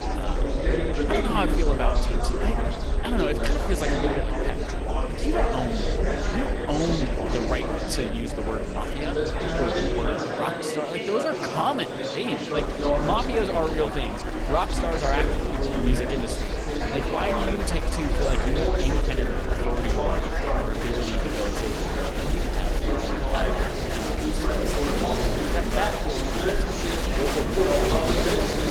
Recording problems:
garbled, watery; slightly; nothing above 18.5 kHz
murmuring crowd; very loud; throughout; 2 dB above the speech
high-pitched whine; faint; until 17 s; 8.5 kHz, 25 dB below the speech
low rumble; faint; until 10 s and from 13 s on; 25 dB below the speech

